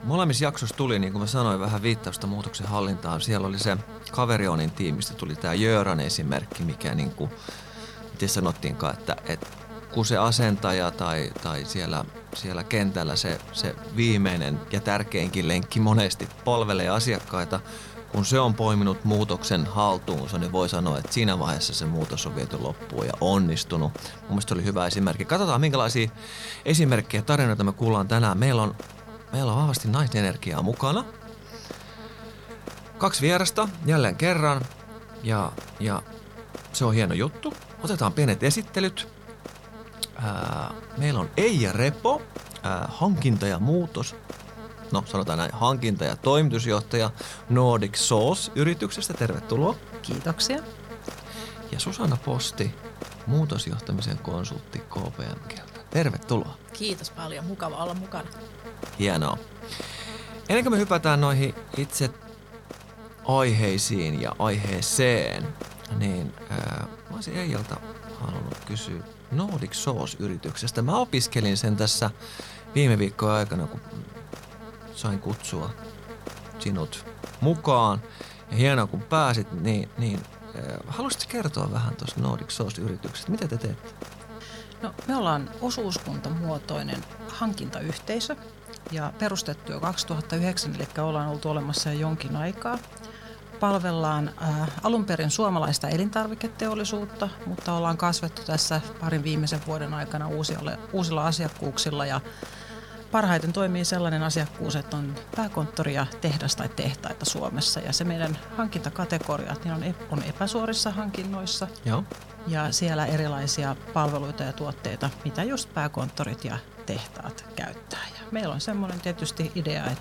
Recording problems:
electrical hum; noticeable; throughout; 50 Hz, 15 dB below the speech

